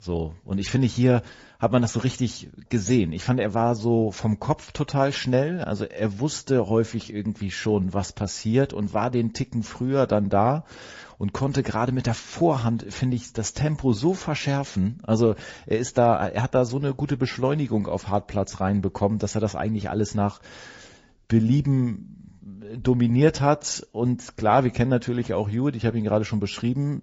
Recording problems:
garbled, watery; slightly; nothing above 7.5 kHz

